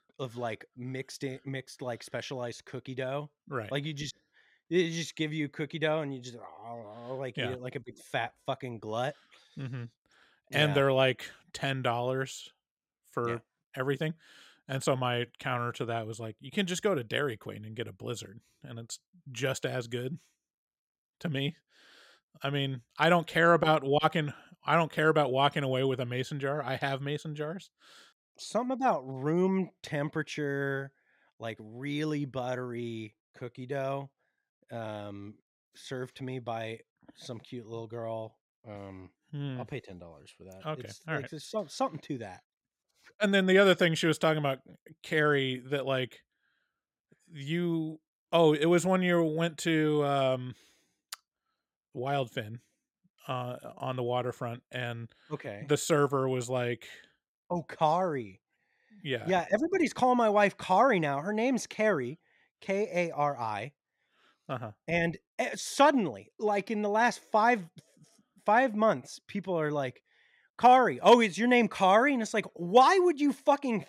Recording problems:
none

